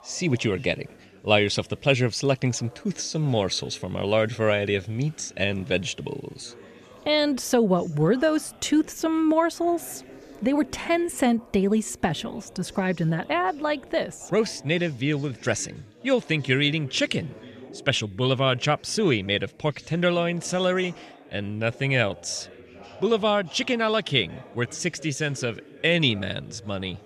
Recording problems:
background chatter; faint; throughout; 4 voices, 20 dB below the speech

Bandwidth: 14.5 kHz